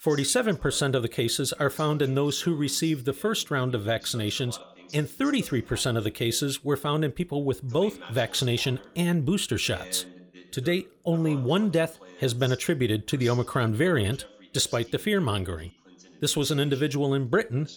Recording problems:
voice in the background; faint; throughout; 20 dB below the speech

